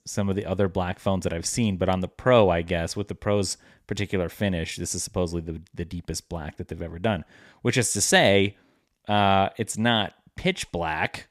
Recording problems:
none

